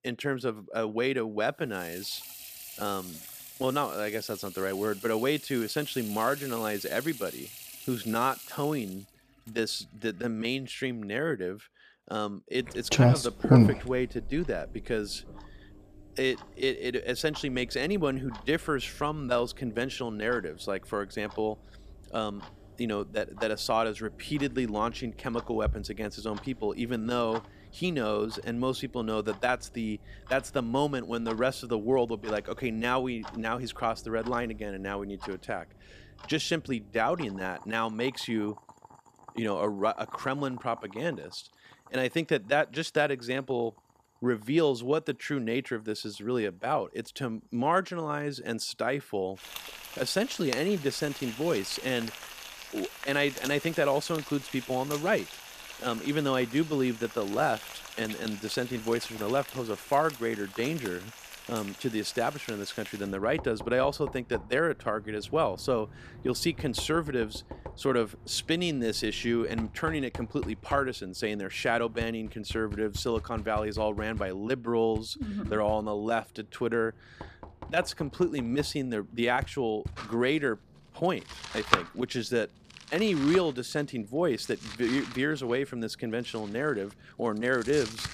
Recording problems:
household noises; loud; throughout; 6 dB below the speech

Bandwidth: 14.5 kHz